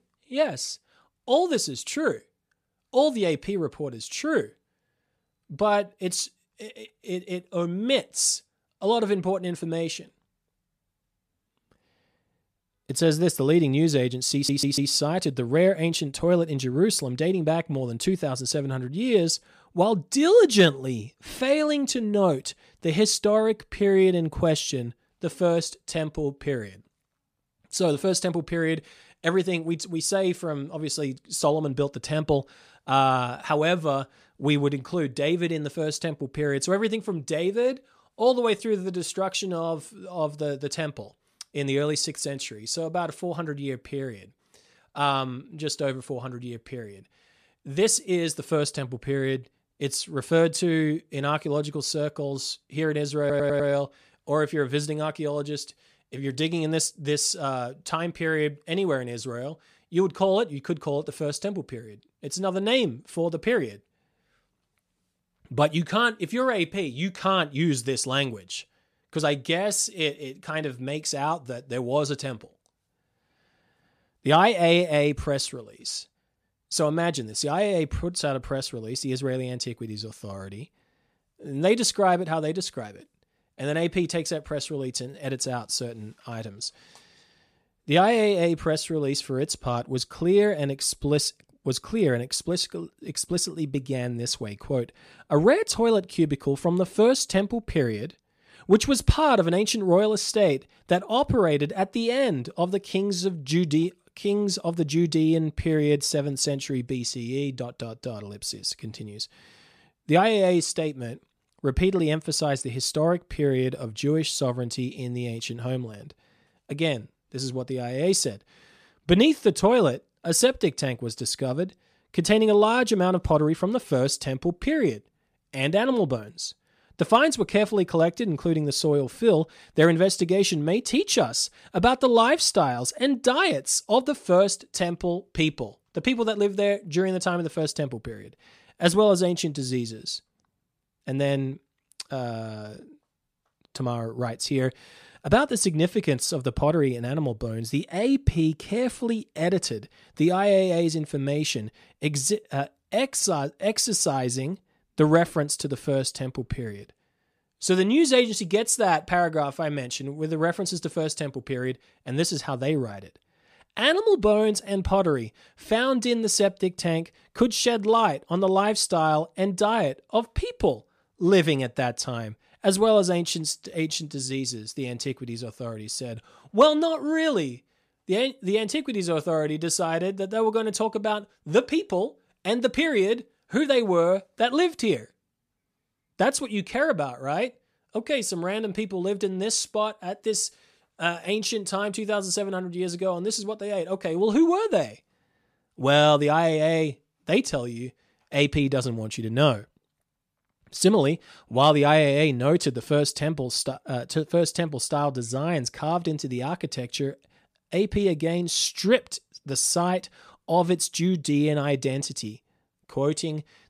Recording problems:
audio stuttering; at 14 s and at 53 s

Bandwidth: 14.5 kHz